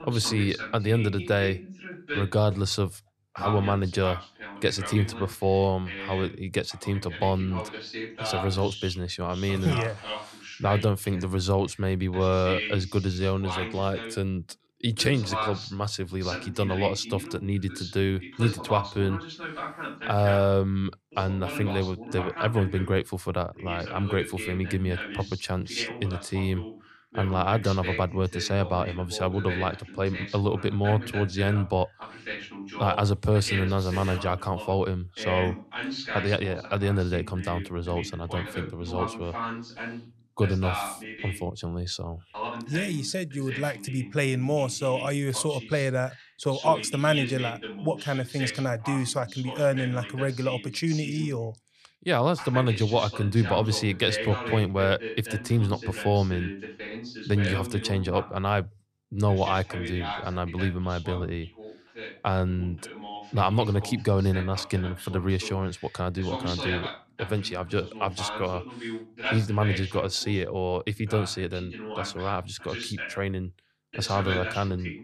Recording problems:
voice in the background; loud; throughout; 9 dB below the speech

